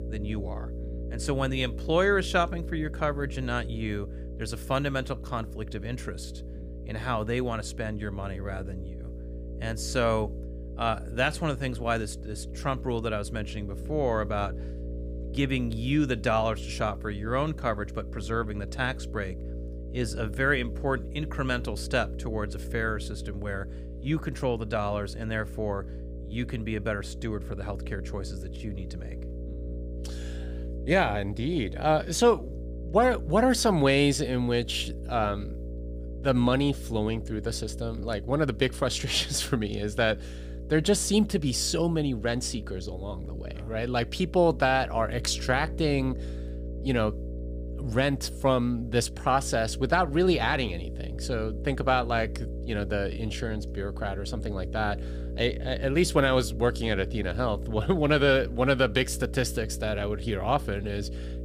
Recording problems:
electrical hum; noticeable; throughout; 60 Hz, 20 dB below the speech

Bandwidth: 15.5 kHz